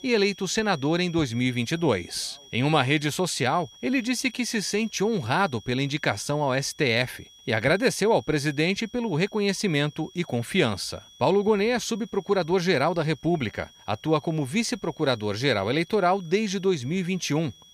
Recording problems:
high-pitched whine; faint; throughout; 3.5 kHz, 25 dB below the speech

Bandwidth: 15 kHz